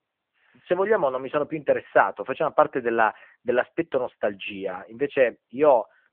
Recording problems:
phone-call audio

